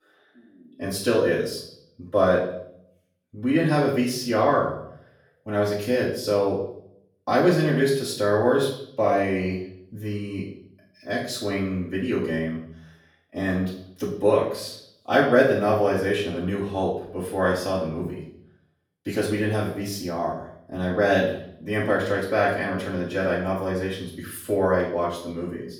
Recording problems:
off-mic speech; far
room echo; noticeable; dies away in 0.6 s

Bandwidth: 18 kHz